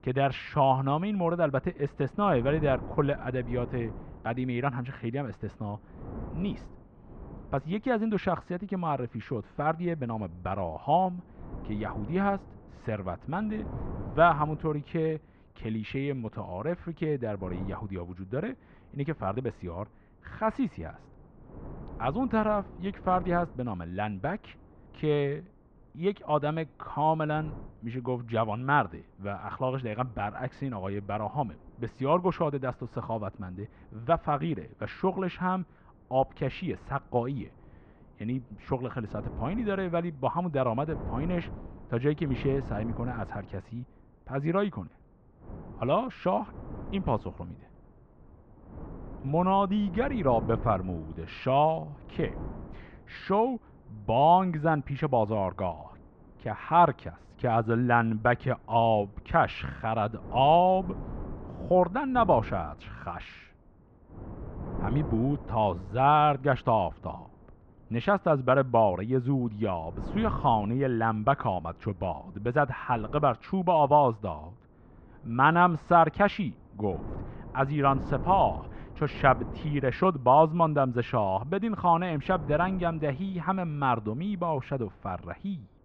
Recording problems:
muffled; very; fading above 2.5 kHz
wind noise on the microphone; occasional gusts; 20 dB below the speech

